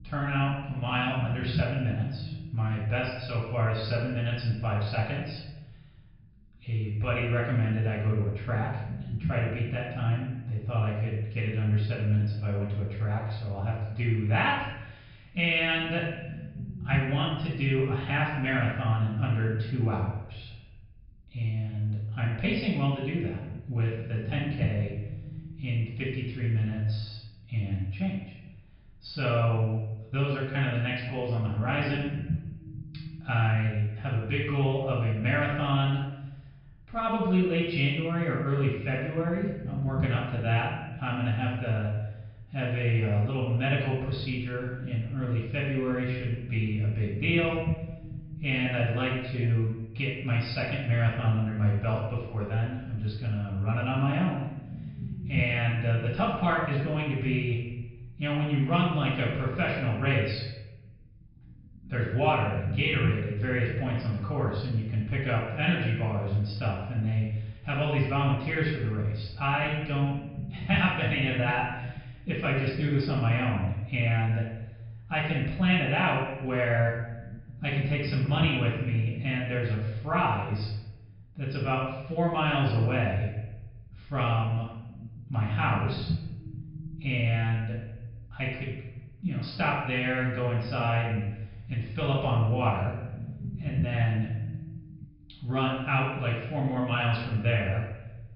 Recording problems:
off-mic speech; far
room echo; noticeable; dies away in 0.8 s
high frequencies cut off; noticeable; nothing above 5.5 kHz
low rumble; noticeable; throughout; 20 dB below the speech

